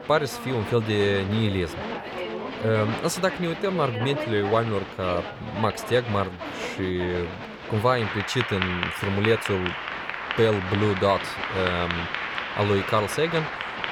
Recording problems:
crowd noise; loud; throughout; 5 dB below the speech

